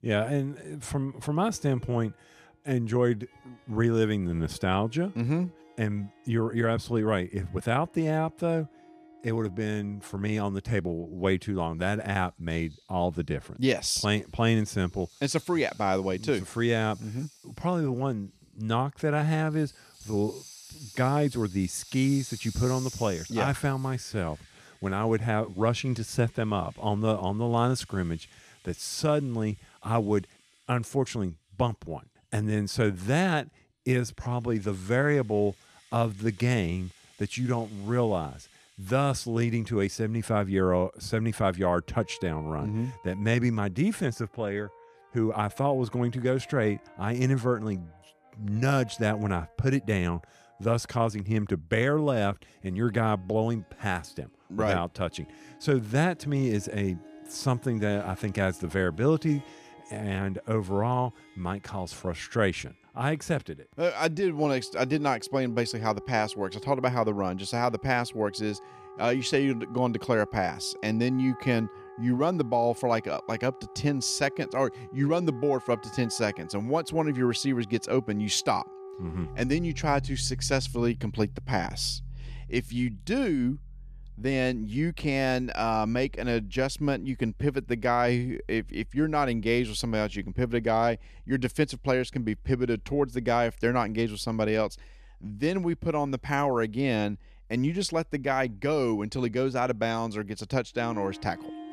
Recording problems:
background music; noticeable; throughout; 20 dB below the speech

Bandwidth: 14.5 kHz